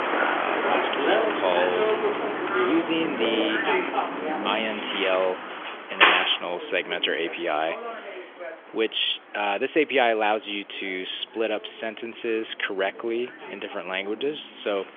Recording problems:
phone-call audio; nothing above 3.5 kHz
traffic noise; very loud; throughout; 2 dB above the speech

